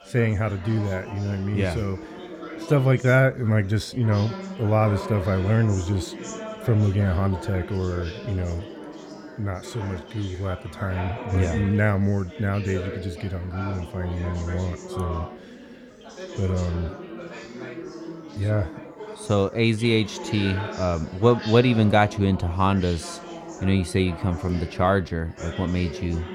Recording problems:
chatter from many people; noticeable; throughout; 10 dB below the speech

